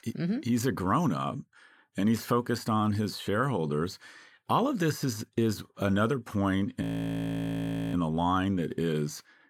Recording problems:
audio freezing; at 7 s for 1 s

